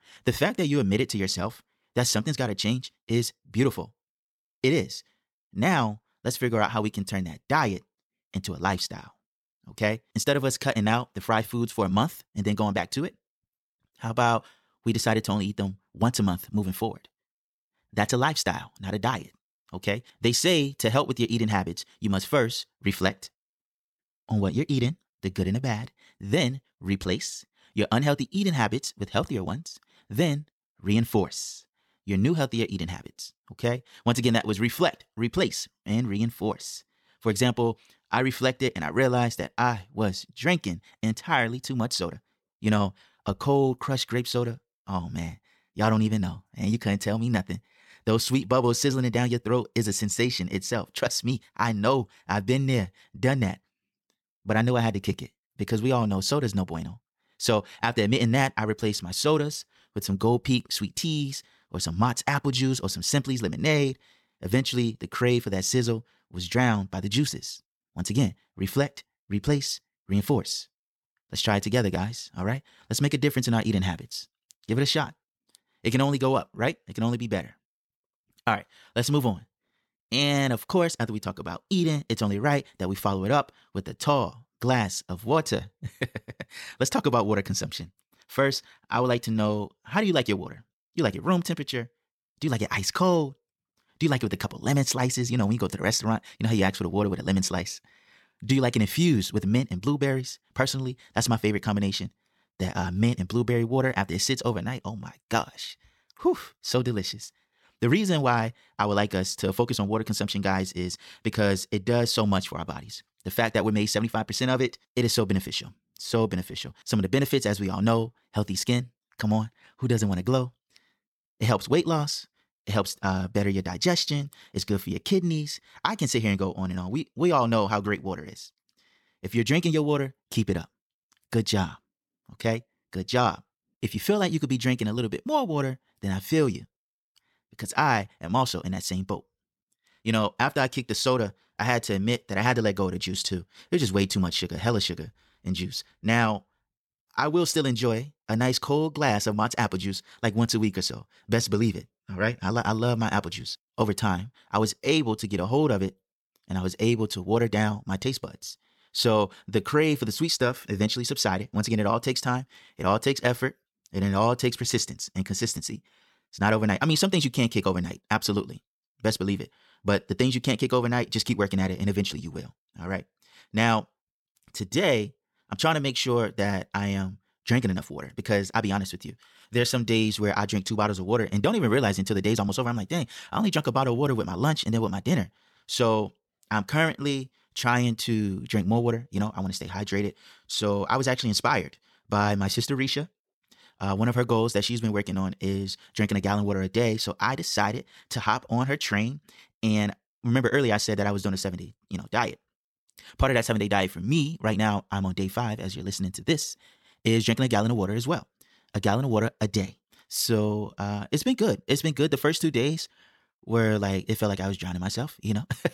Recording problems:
wrong speed, natural pitch; too fast; 1.5 times normal speed

